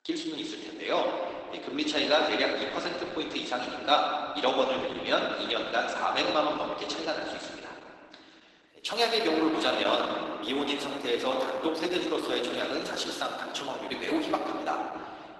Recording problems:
garbled, watery; badly; nothing above 12 kHz
room echo; noticeable; dies away in 2.1 s
thin; somewhat; fading below 300 Hz
off-mic speech; somewhat distant

